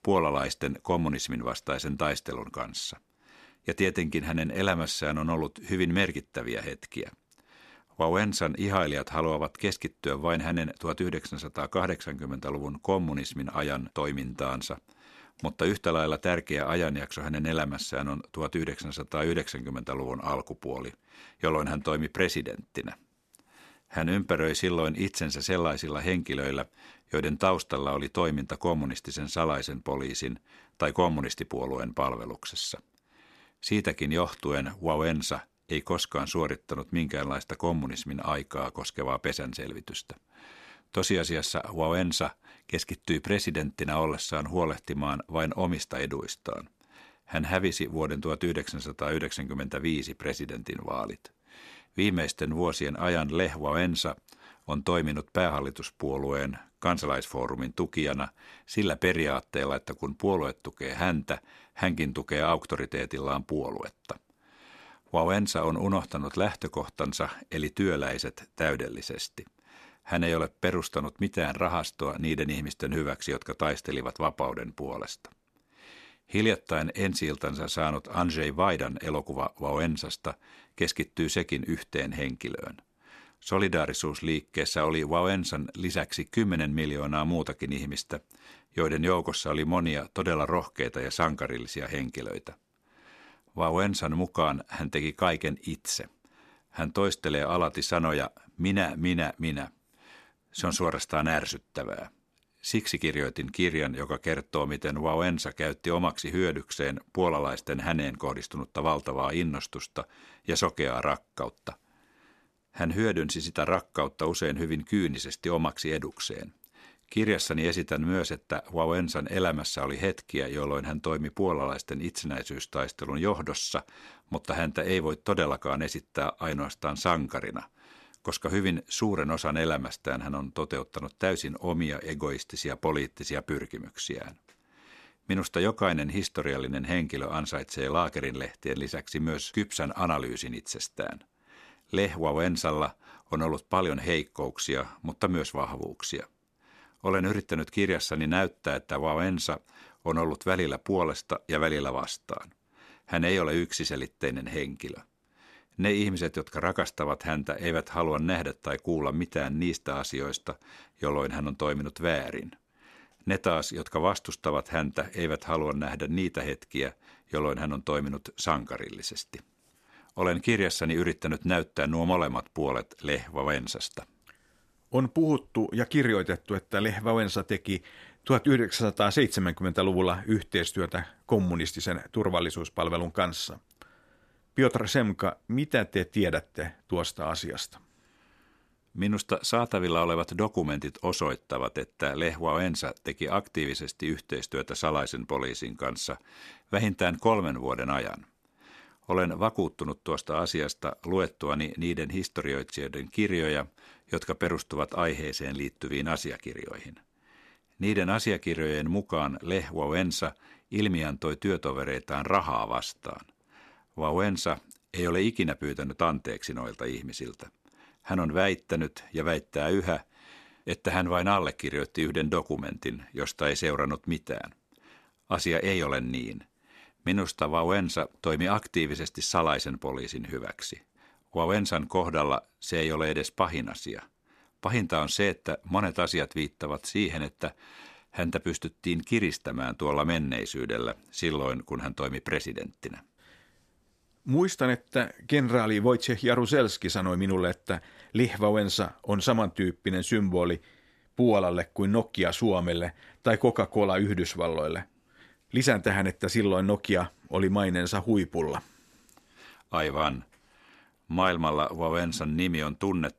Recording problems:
none

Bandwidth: 14 kHz